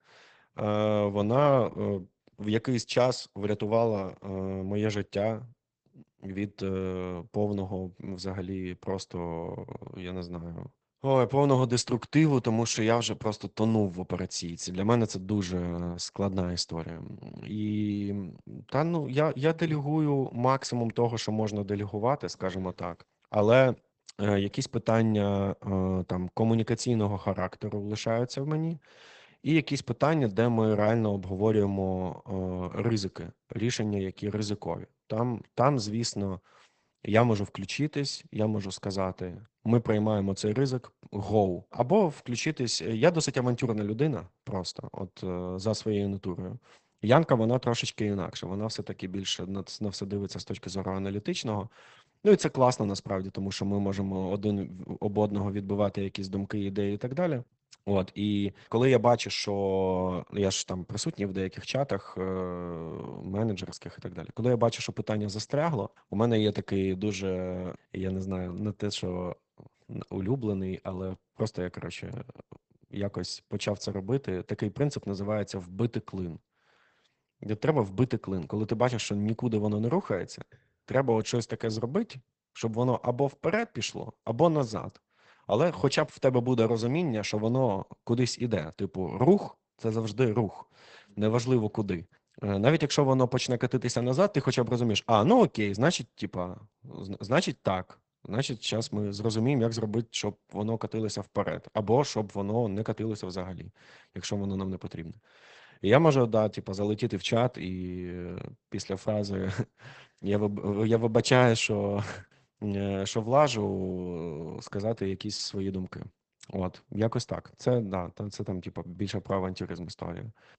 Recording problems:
garbled, watery; badly; nothing above 8 kHz

